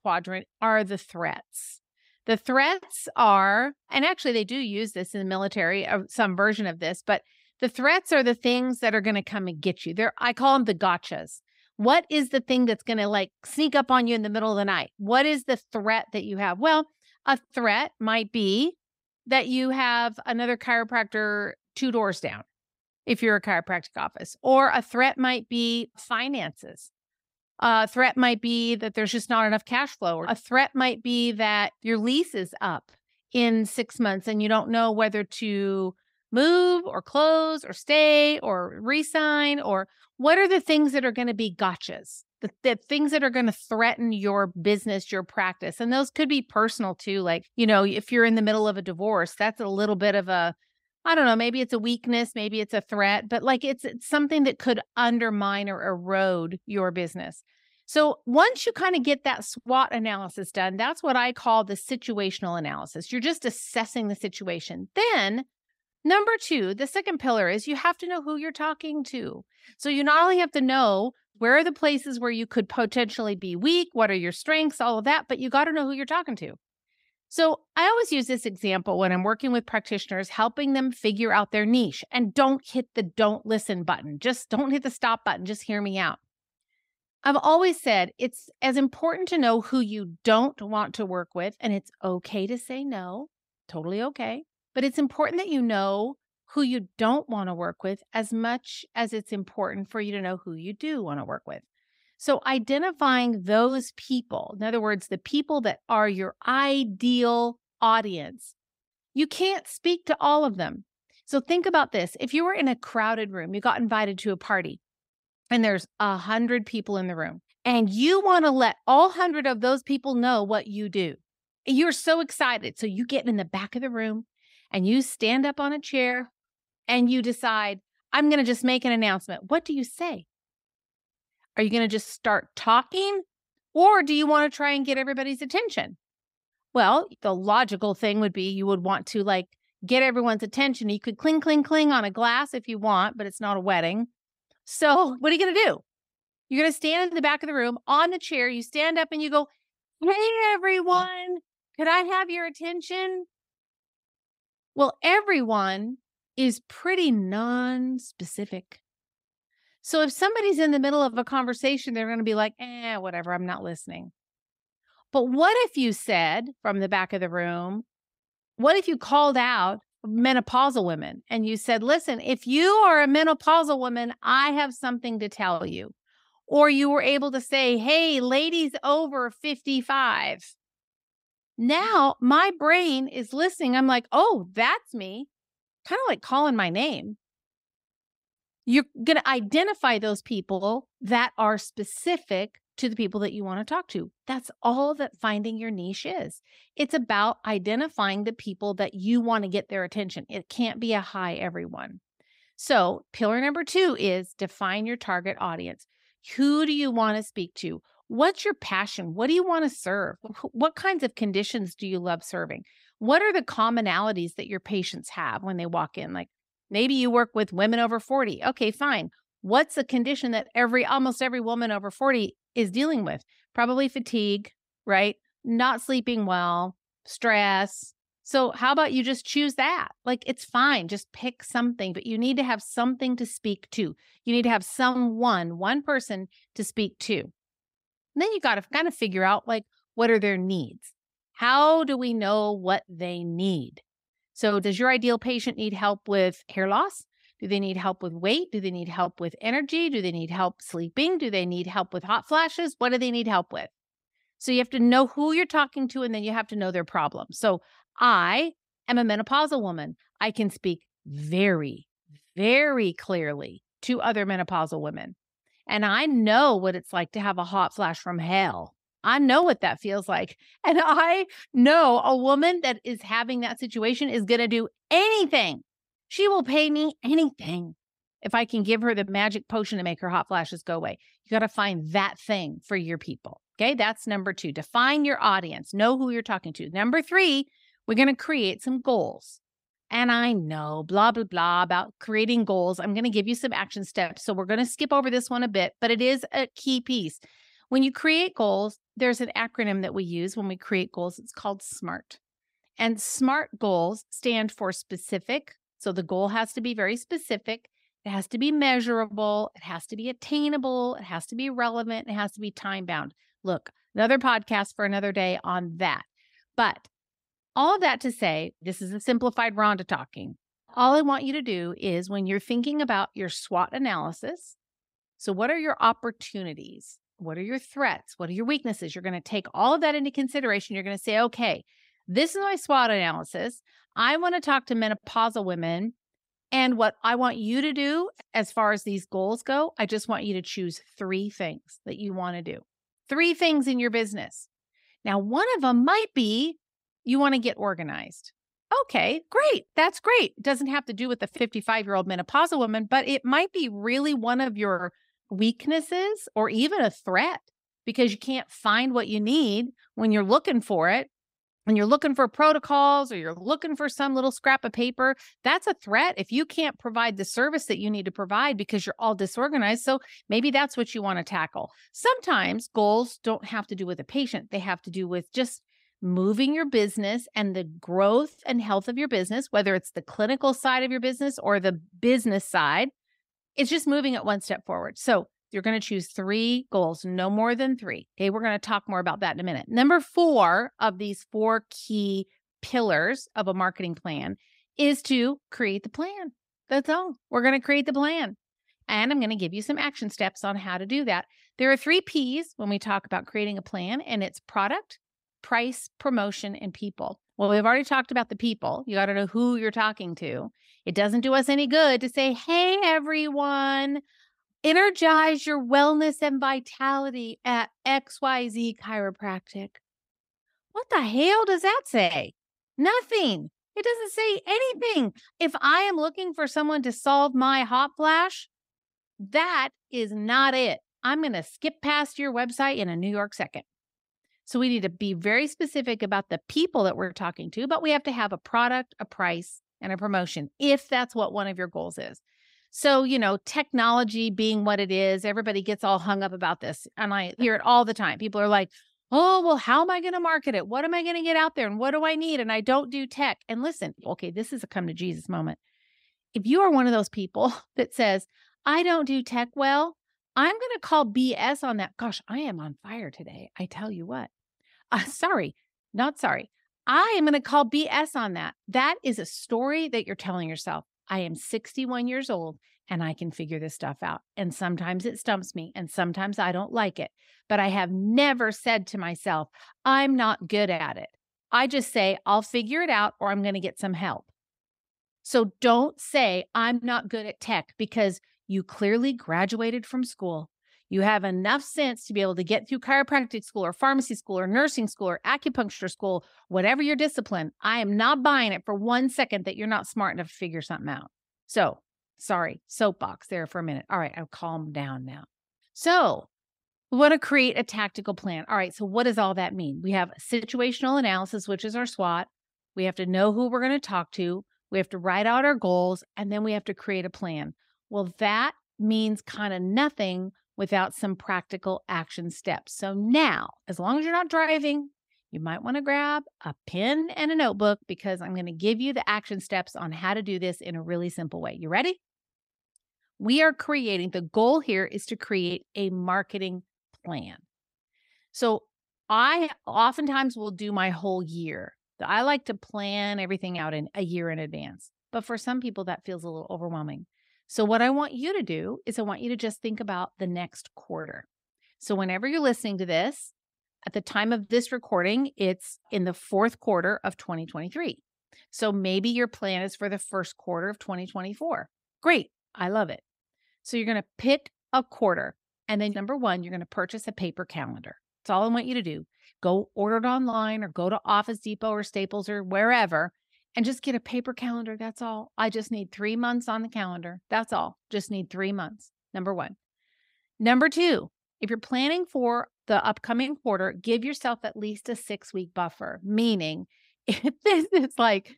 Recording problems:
none

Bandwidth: 15.5 kHz